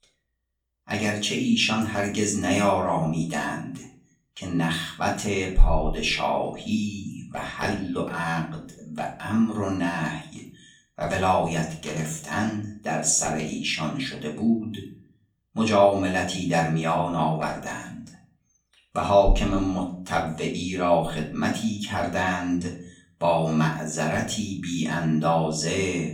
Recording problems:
off-mic speech; far
room echo; slight; dies away in 0.4 s

